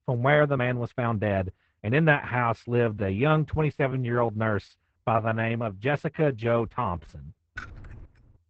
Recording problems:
garbled, watery; badly; nothing above 8 kHz
muffled; very slightly; fading above 2 kHz
uneven, jittery; strongly; from 0.5 to 7 s
jangling keys; faint; at 7.5 s; peak 15 dB below the speech

